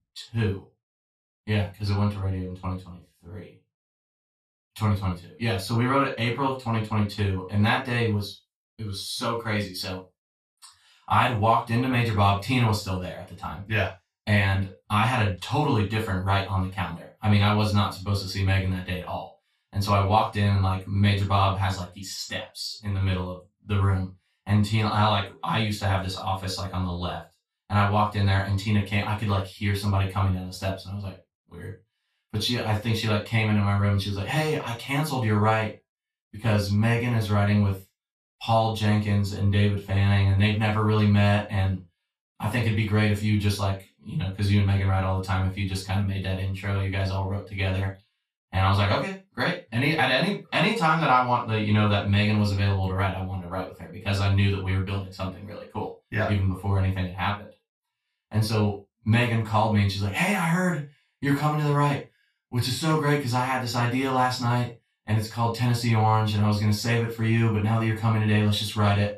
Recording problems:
off-mic speech; far
room echo; noticeable; dies away in 0.2 s

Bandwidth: 14 kHz